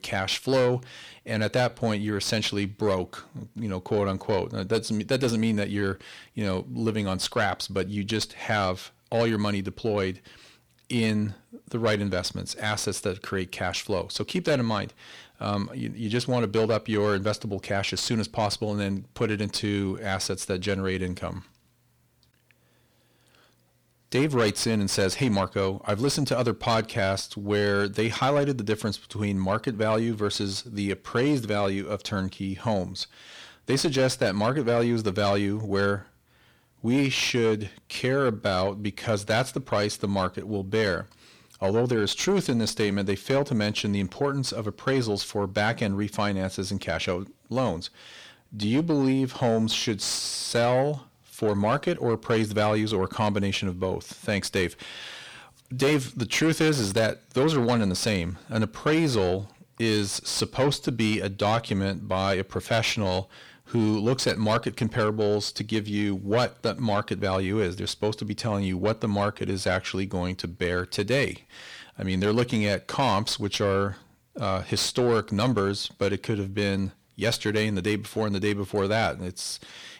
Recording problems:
distortion; slight; 10 dB below the speech

